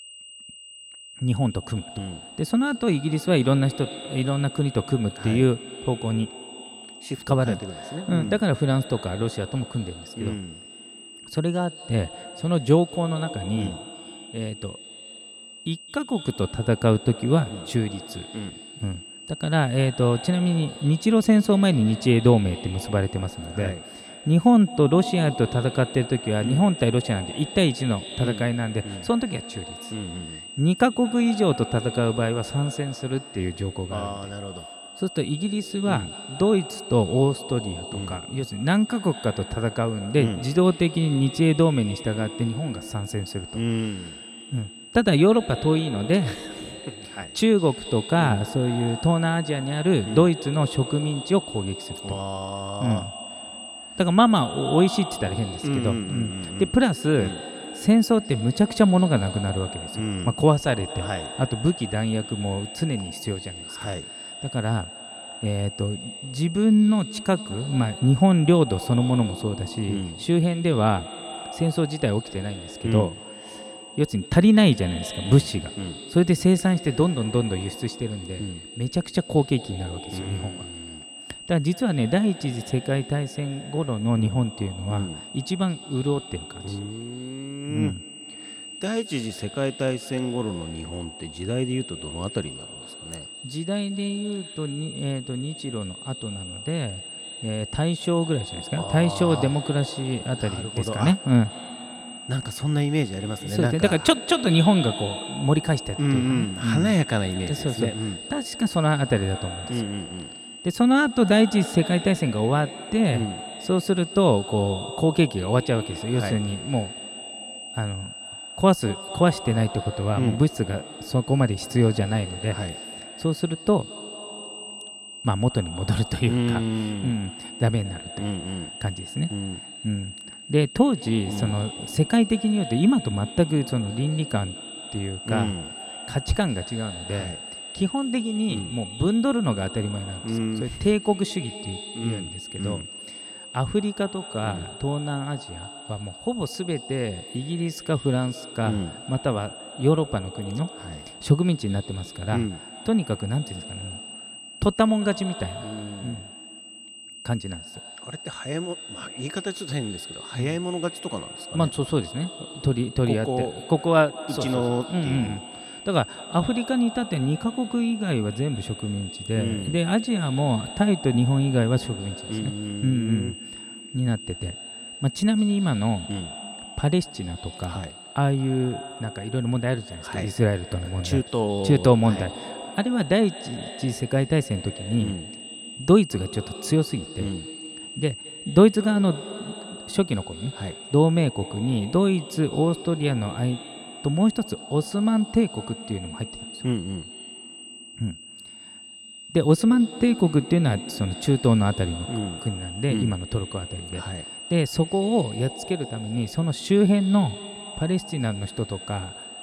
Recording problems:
echo of what is said; noticeable; throughout; 220 ms later, 15 dB below the speech
high-pitched whine; noticeable; throughout; 3 kHz, 15 dB below the speech

